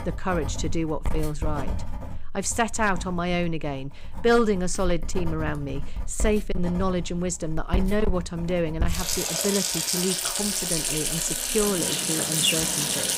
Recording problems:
distortion; slight; 1.8% of the sound clipped
household noises; very loud; throughout; as loud as the speech
animal sounds; loud; from 10 s on; 2 dB below the speech

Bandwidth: 15.5 kHz